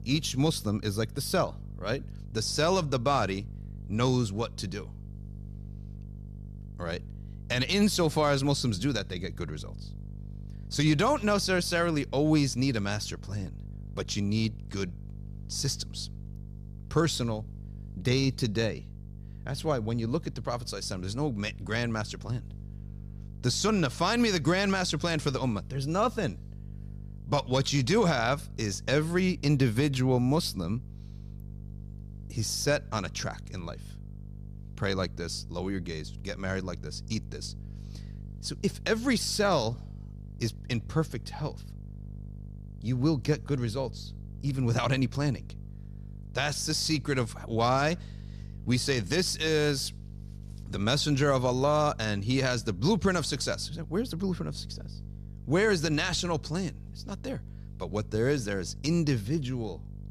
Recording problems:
electrical hum; faint; throughout; 50 Hz, 25 dB below the speech

